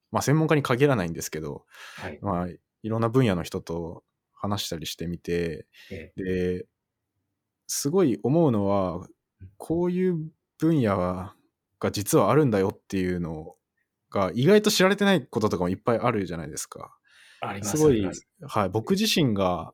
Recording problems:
none

